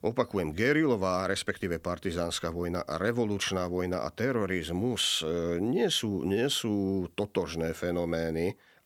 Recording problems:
none

